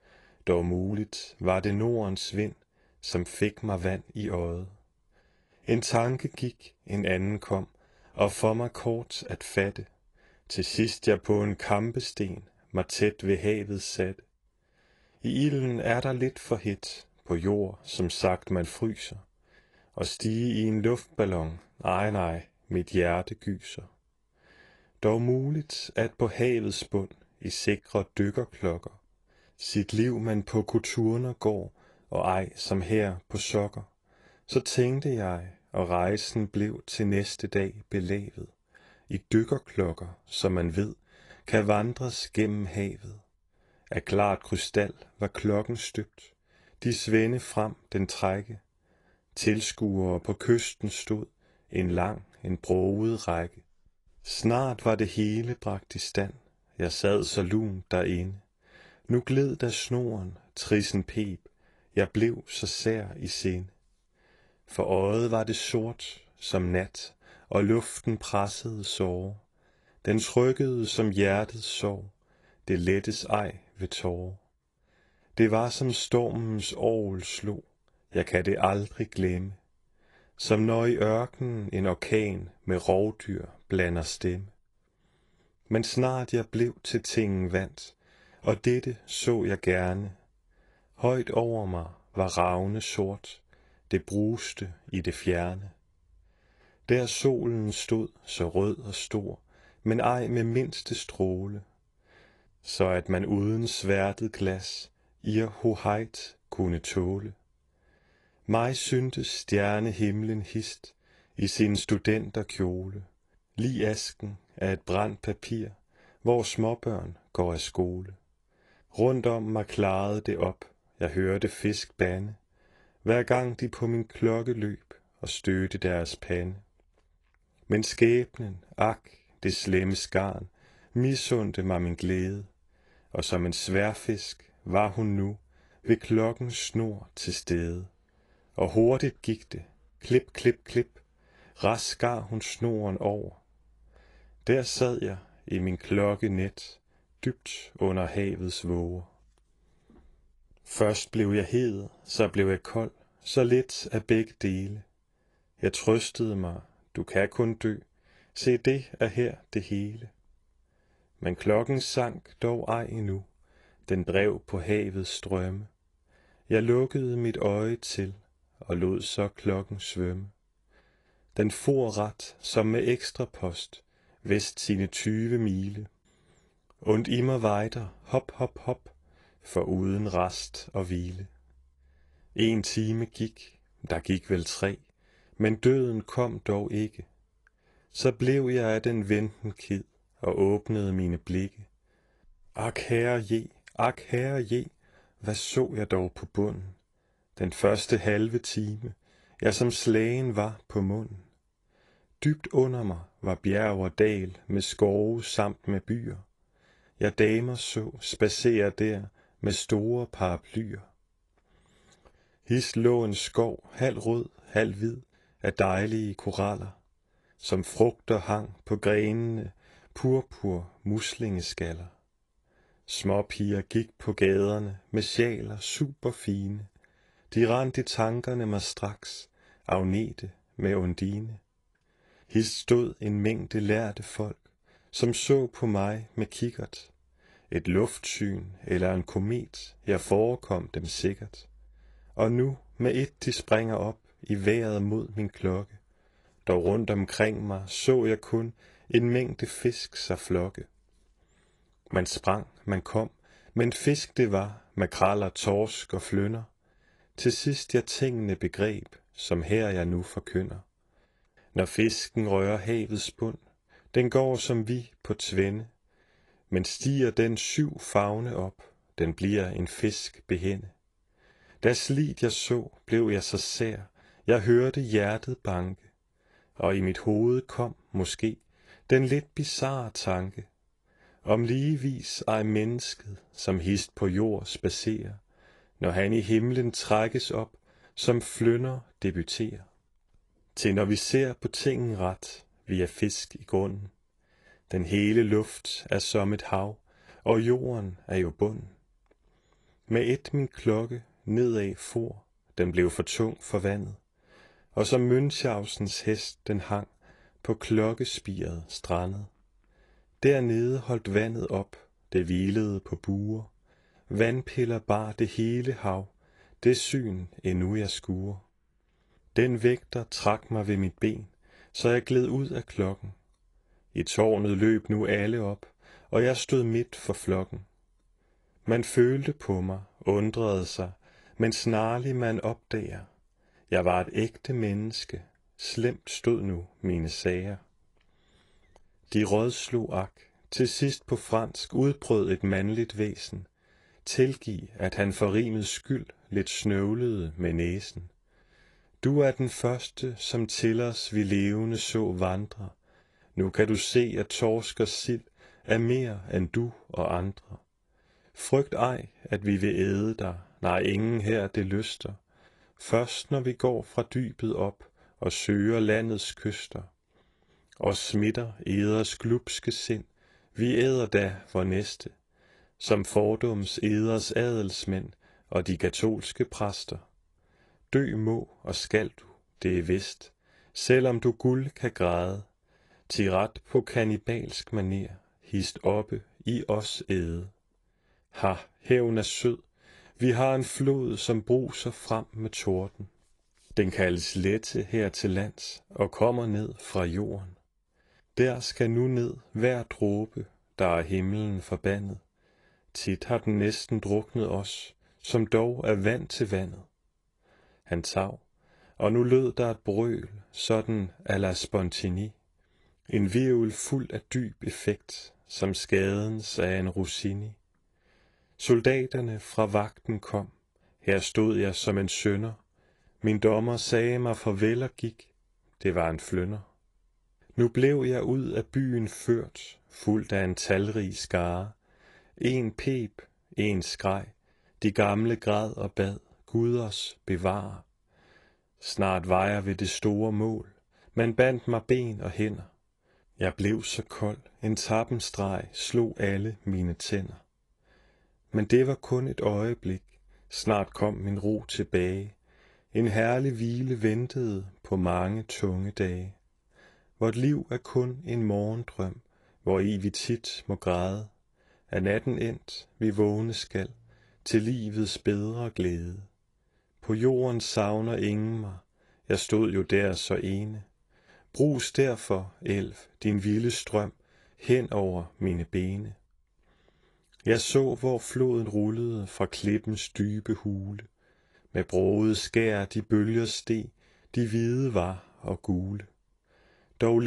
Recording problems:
garbled, watery; slightly; nothing above 11 kHz
abrupt cut into speech; at the end

